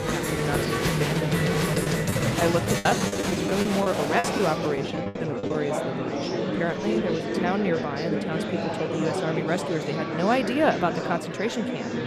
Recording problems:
murmuring crowd; very loud; throughout; 1 dB above the speech
choppy; very; from 2.5 to 5.5 s; 18% of the speech affected

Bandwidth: 14.5 kHz